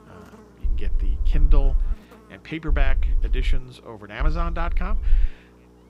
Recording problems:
electrical hum; noticeable; throughout; 60 Hz, 20 dB below the speech
low rumble; noticeable; from 0.5 to 2 s, at 2.5 s and from 4 to 5.5 s; 20 dB below the speech

